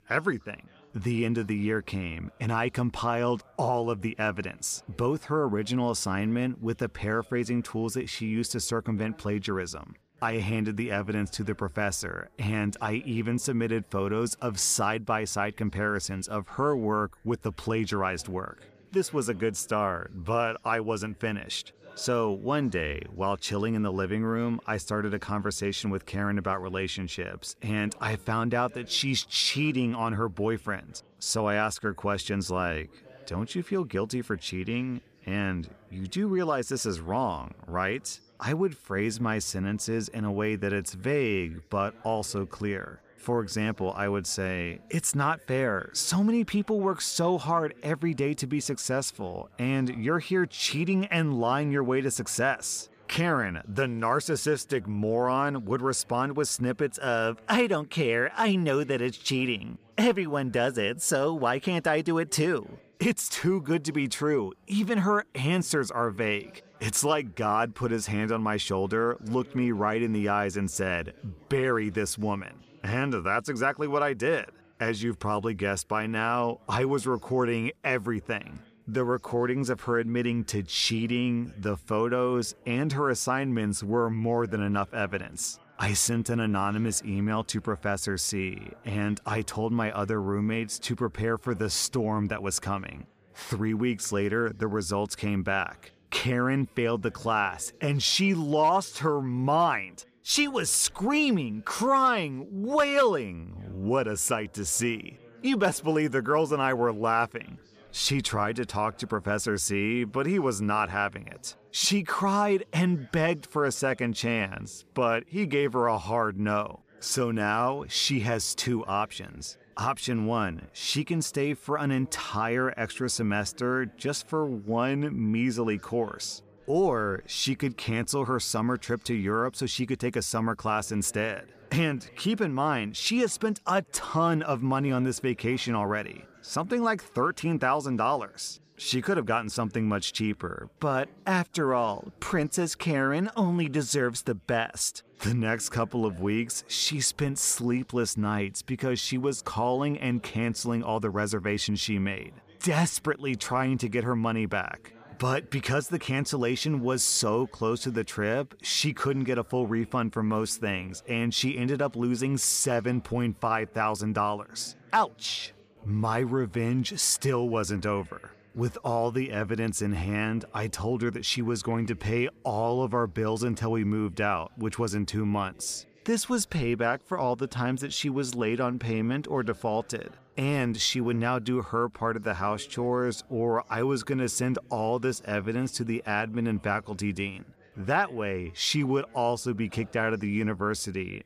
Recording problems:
background chatter; faint; throughout; 3 voices, 30 dB below the speech

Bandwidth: 14.5 kHz